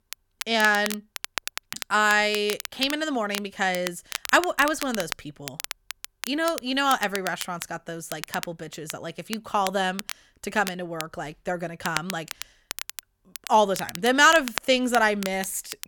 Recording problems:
crackle, like an old record; noticeable; 10 dB below the speech

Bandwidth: 17.5 kHz